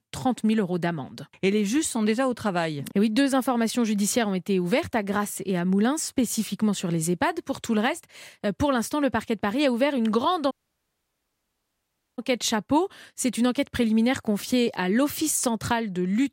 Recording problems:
audio cutting out; at 11 s for 1.5 s

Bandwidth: 16 kHz